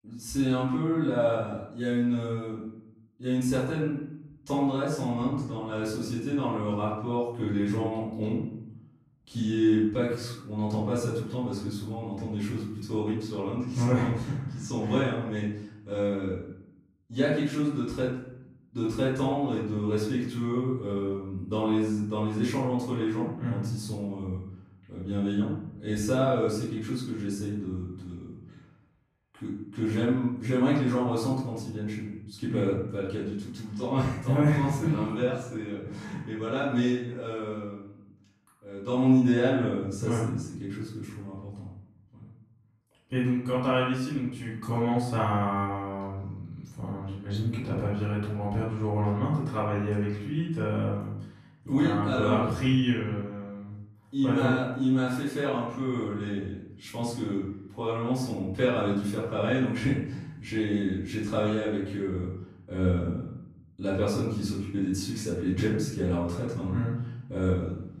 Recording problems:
off-mic speech; far
room echo; noticeable; dies away in 0.7 s

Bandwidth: 14 kHz